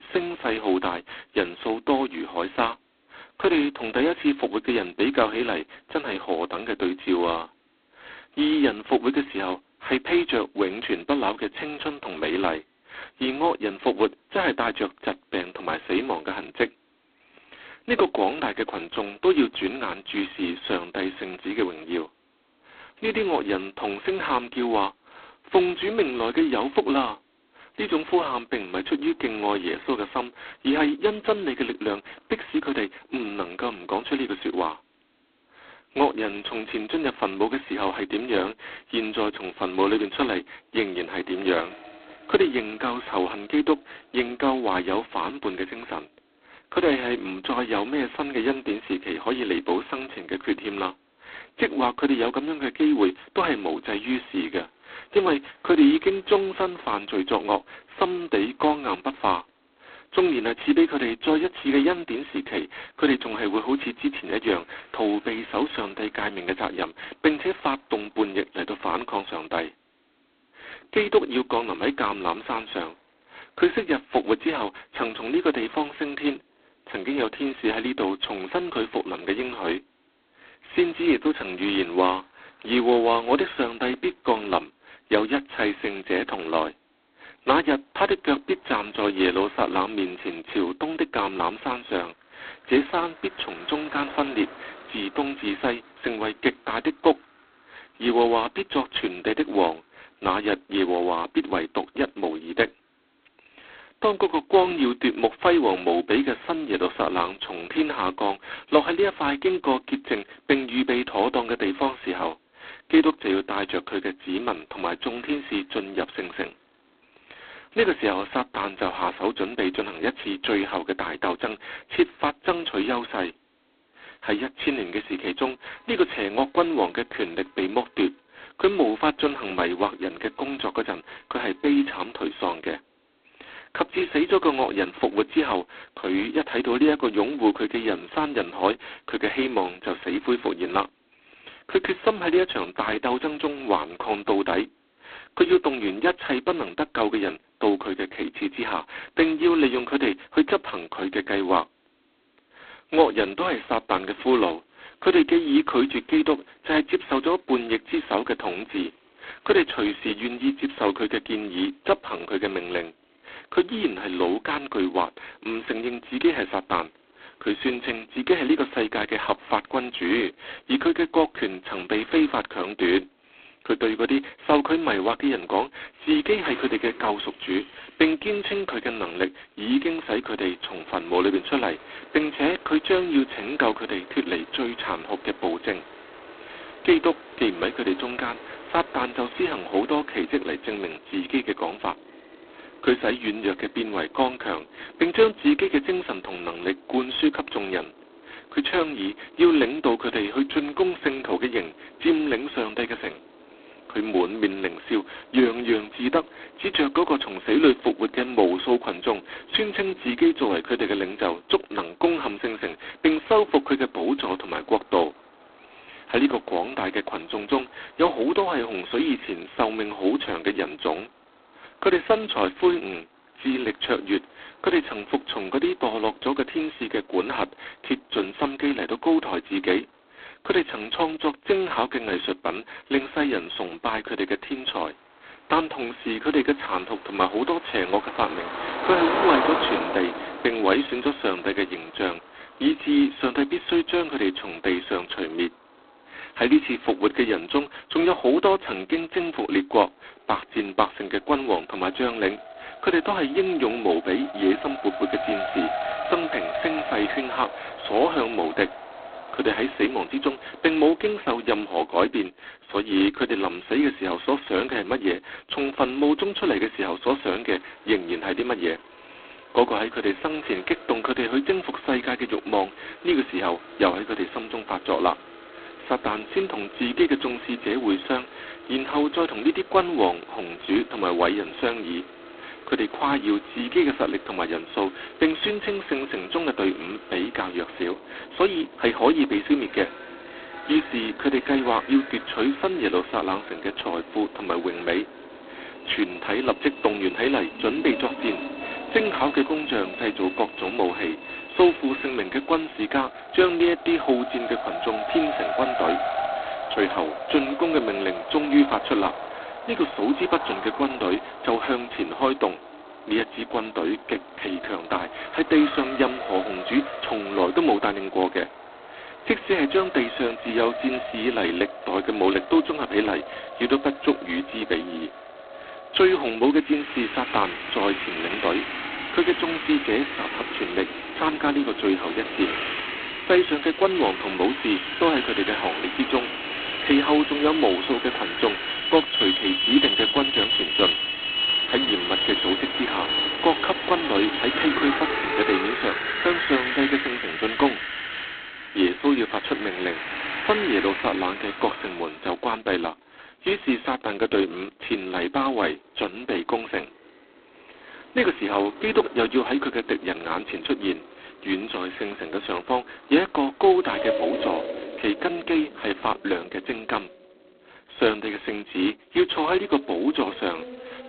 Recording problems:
phone-call audio; poor line; nothing above 4 kHz
traffic noise; loud; throughout; 7 dB below the speech

